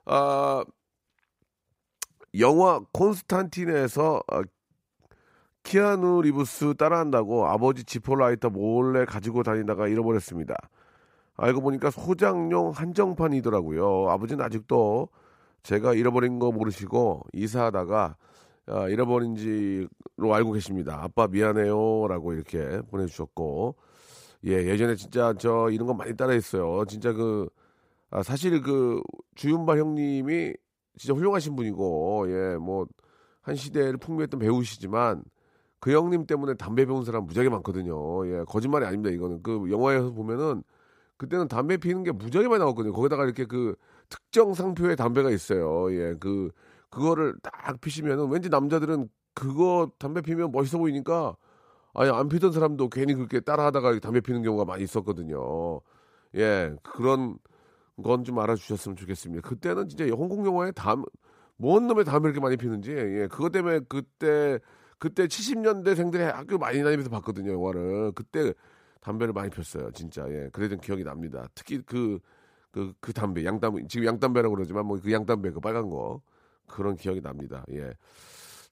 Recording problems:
none

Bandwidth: 15.5 kHz